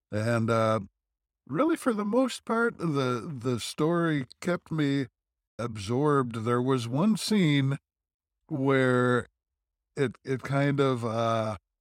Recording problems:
none

